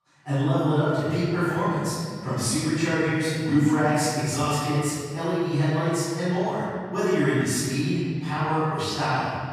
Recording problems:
room echo; strong; dies away in 1.9 s
off-mic speech; far

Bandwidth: 14.5 kHz